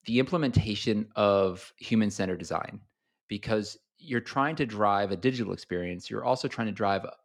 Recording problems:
none

